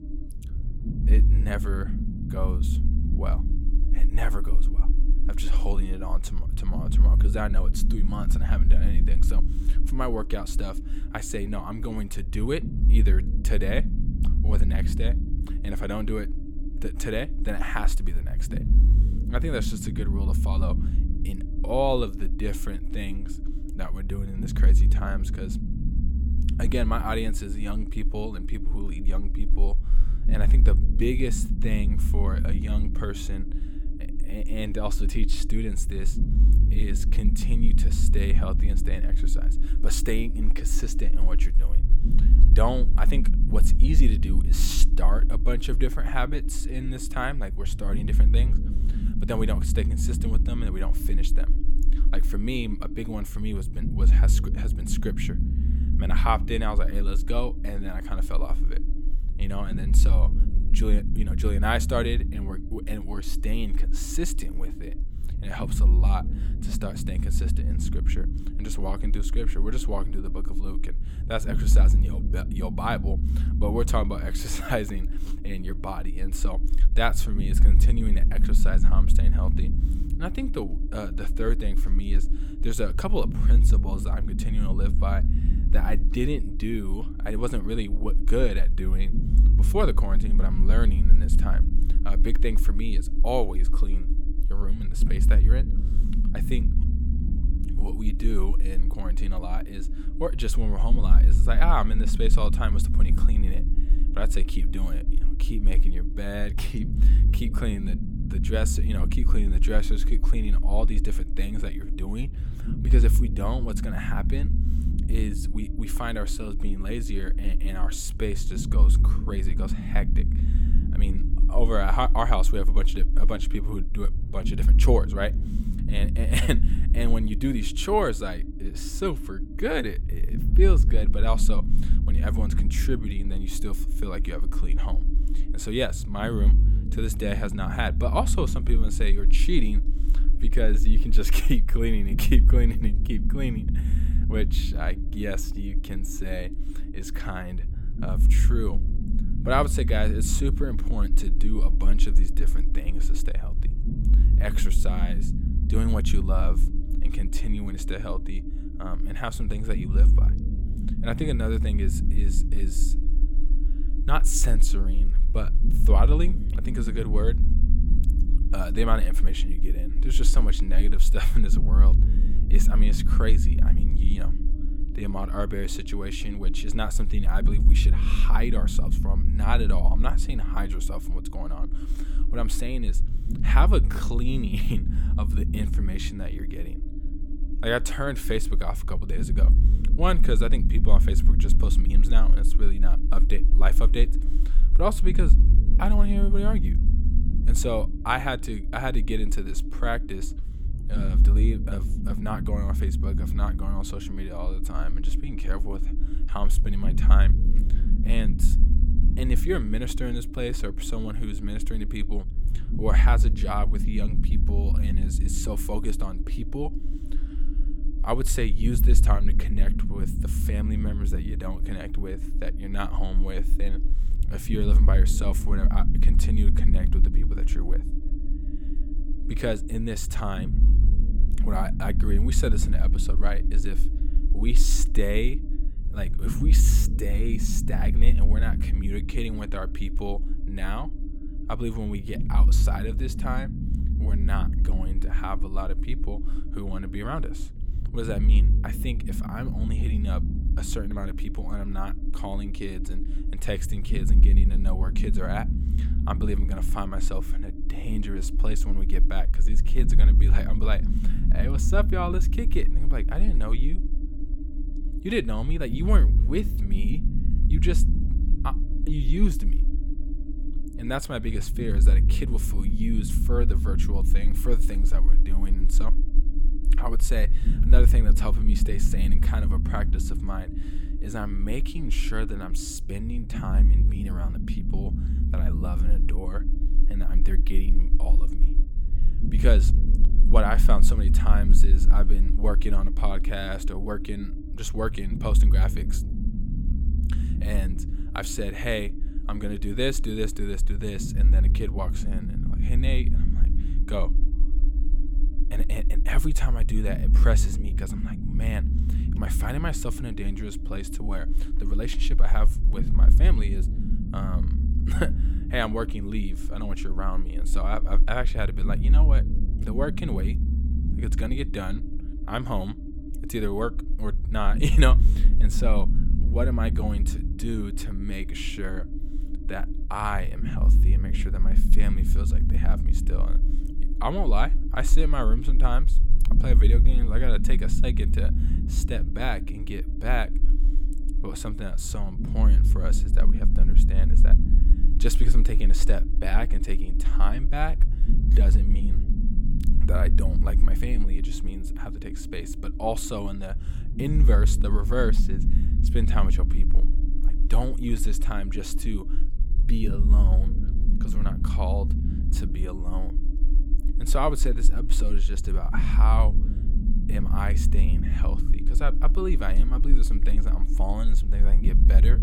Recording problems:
low rumble; loud; throughout; 9 dB below the speech

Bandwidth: 17 kHz